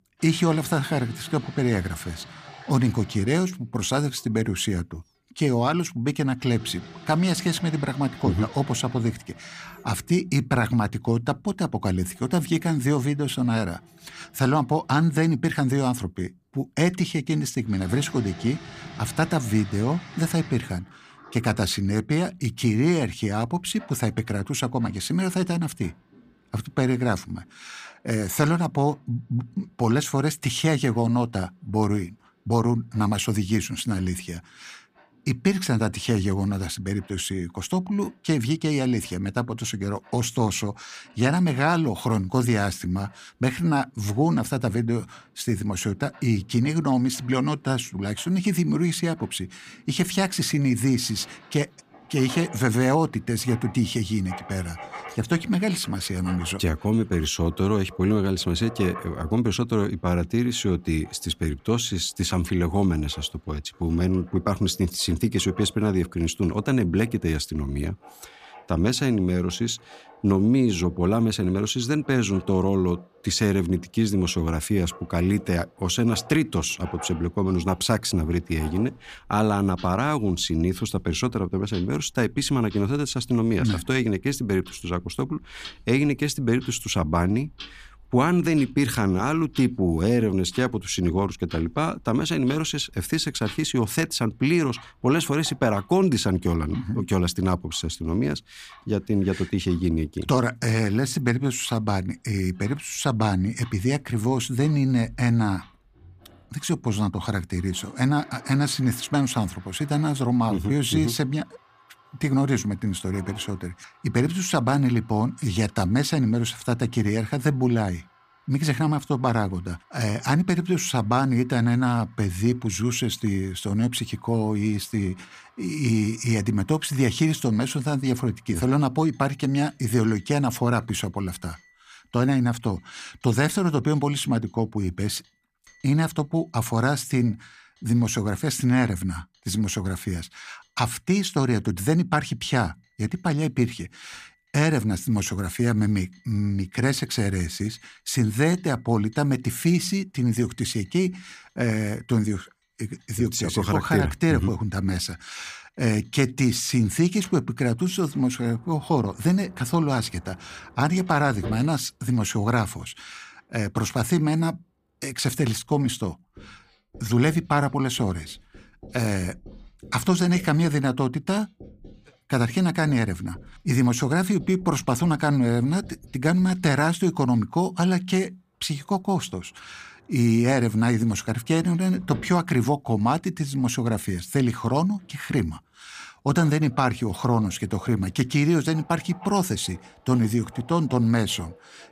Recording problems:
household noises; faint; throughout; 25 dB below the speech

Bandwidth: 15 kHz